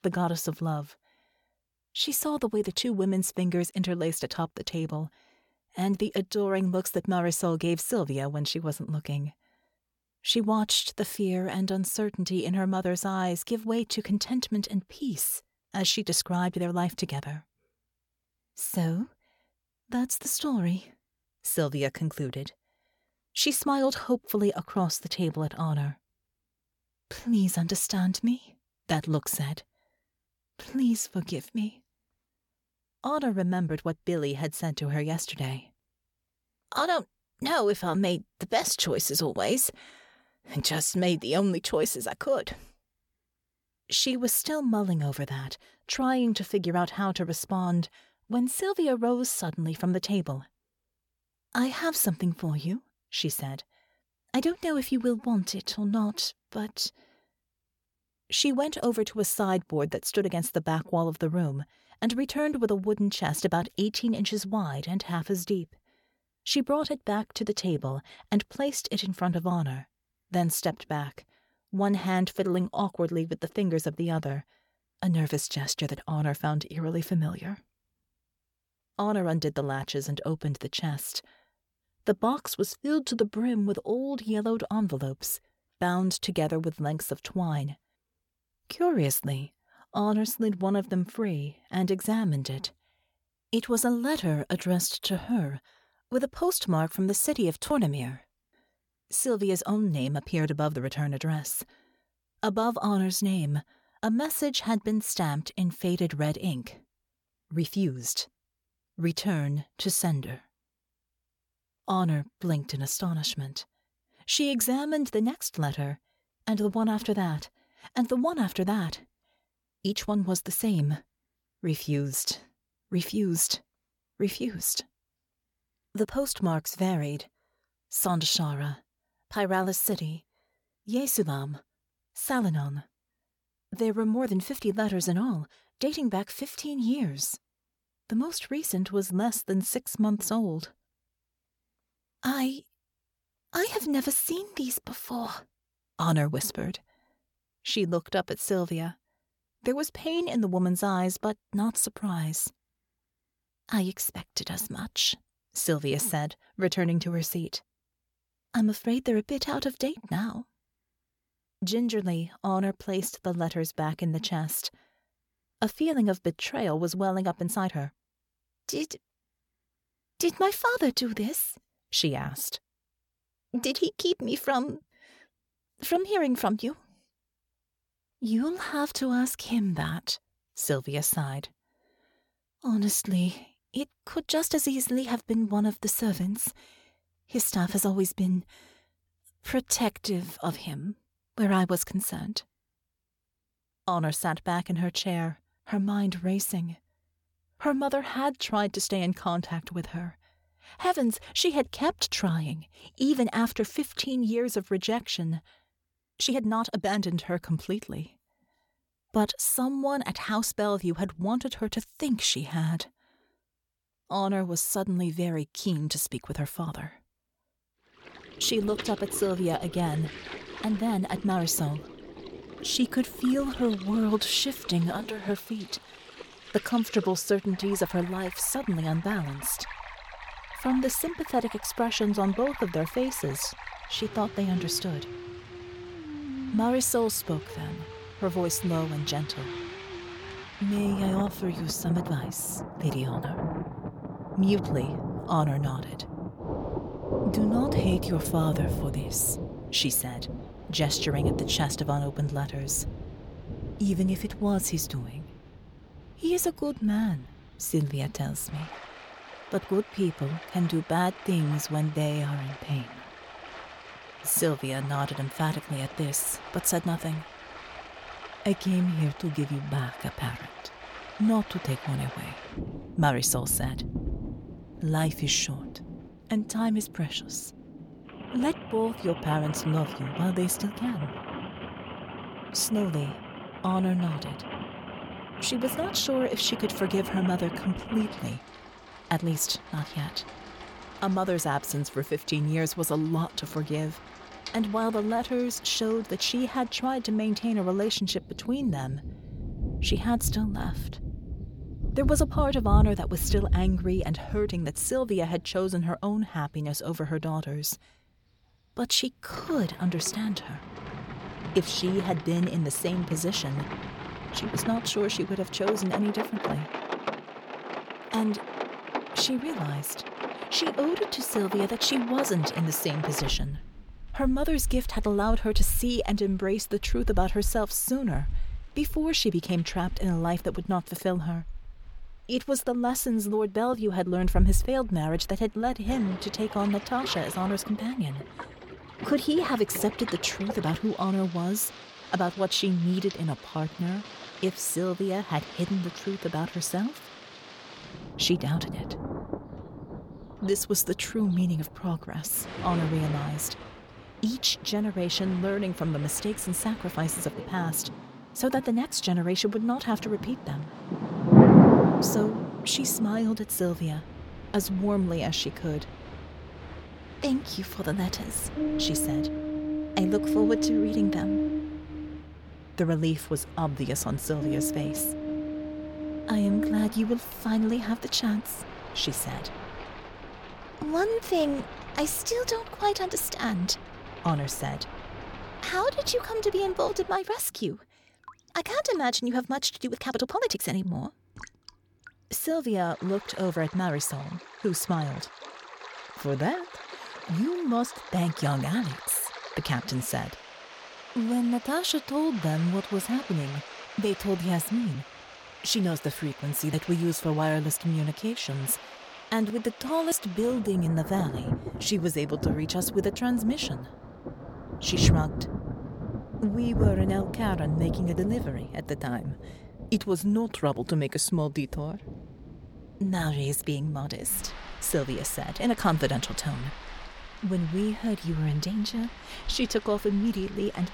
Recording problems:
rain or running water; loud; from 3:38 on; 6 dB below the speech
uneven, jittery; strongly; from 2:47 to 6:31

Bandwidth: 17.5 kHz